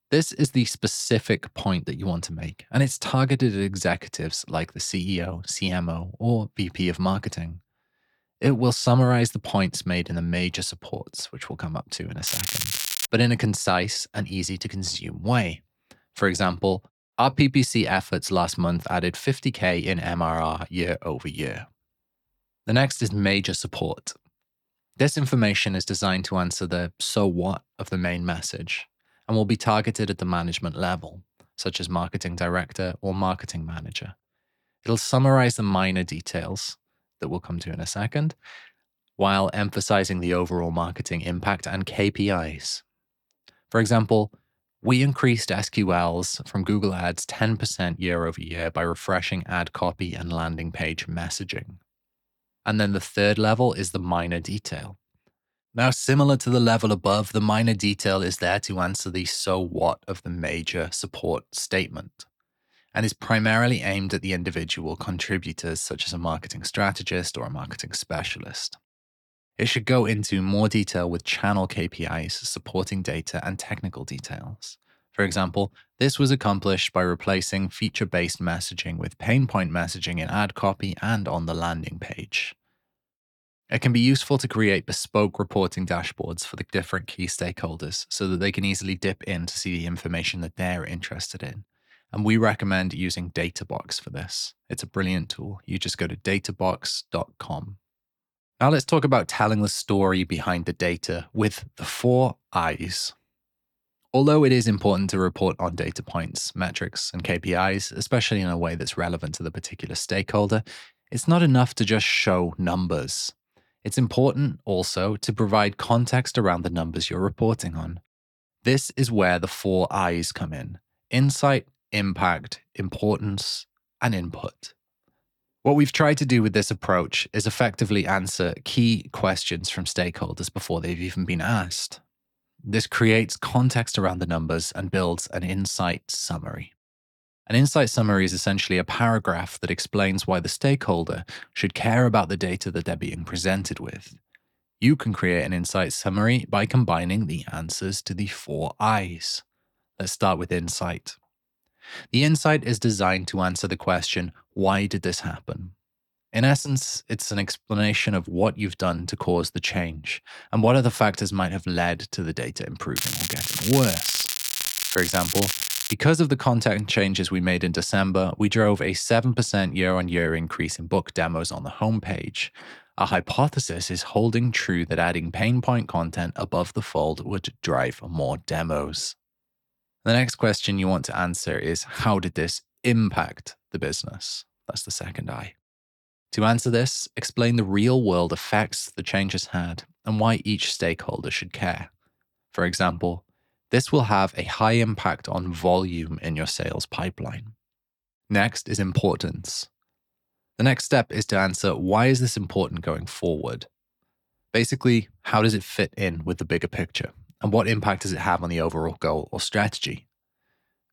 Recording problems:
crackling; loud; at 12 s and from 2:43 to 2:46; 1 dB below the speech

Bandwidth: 18.5 kHz